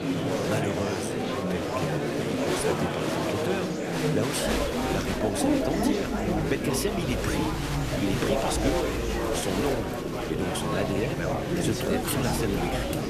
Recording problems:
murmuring crowd; very loud; throughout; 4 dB above the speech

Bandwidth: 14 kHz